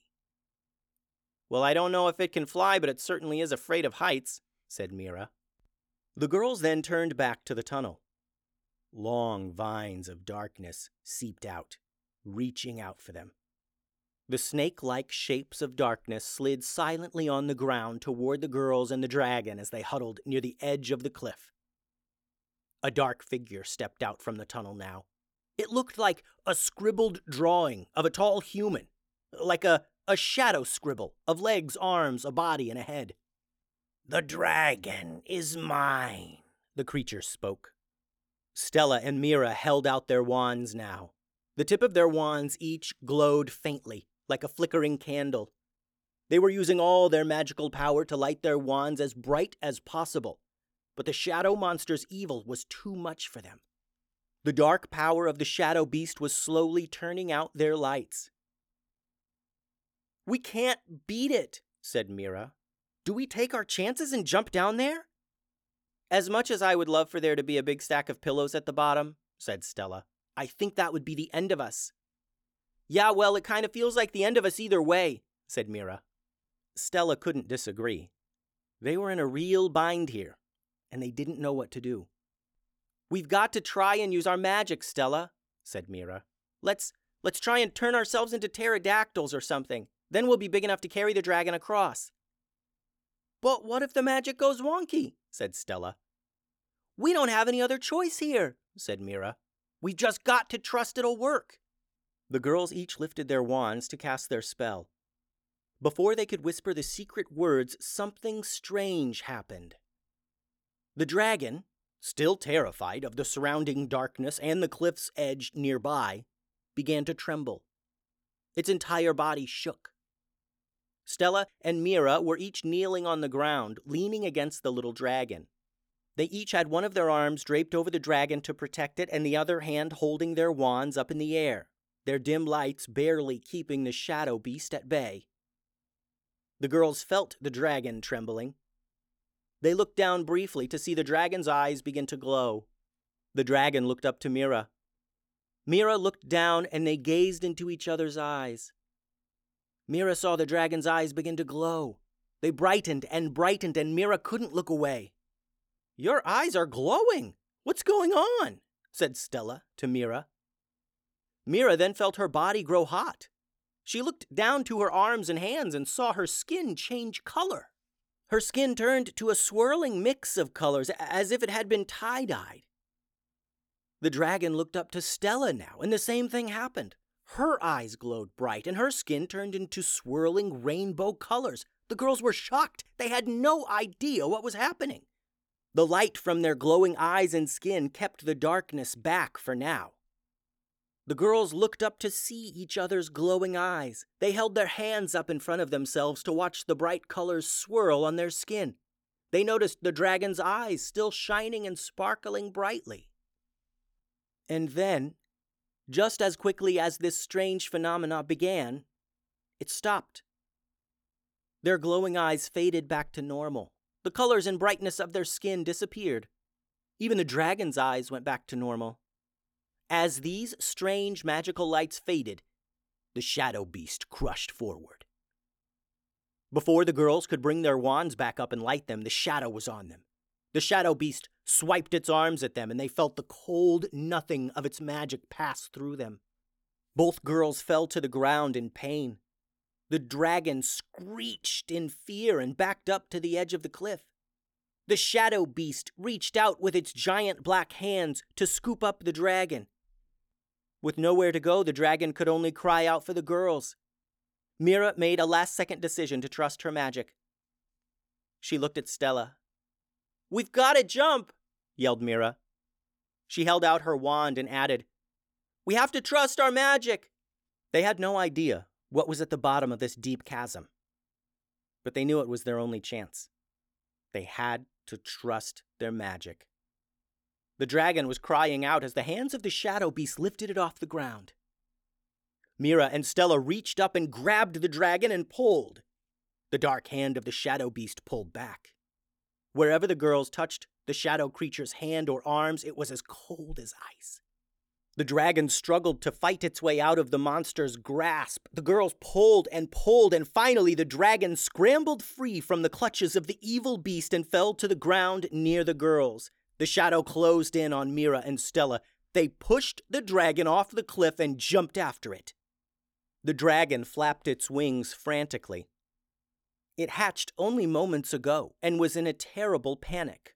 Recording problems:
none

